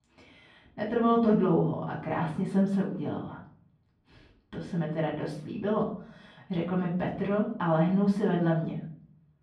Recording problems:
off-mic speech; far
muffled; very; fading above 2.5 kHz
room echo; slight; dies away in 0.5 s

